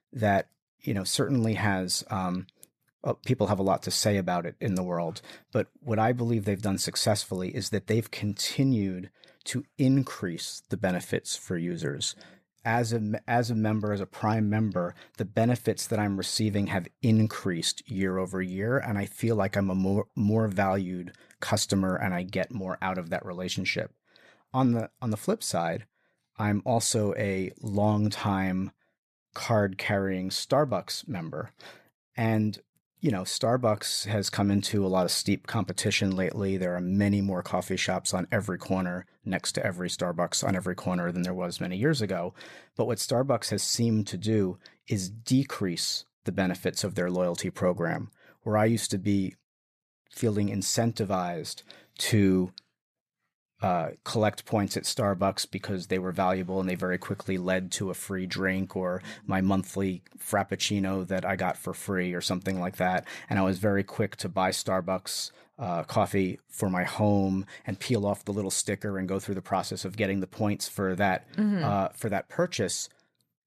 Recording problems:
none

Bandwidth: 14.5 kHz